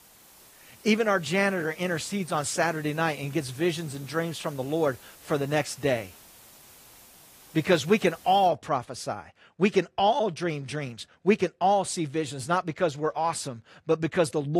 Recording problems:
garbled, watery; slightly
hiss; faint; until 8.5 s; 20 dB below the speech
abrupt cut into speech; at the end

